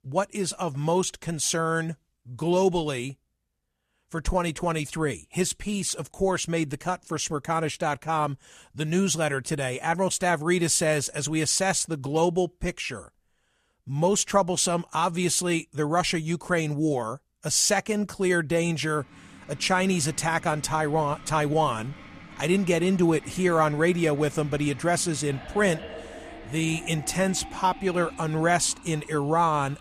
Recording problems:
household noises; noticeable; from 19 s on; 20 dB below the speech

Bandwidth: 13.5 kHz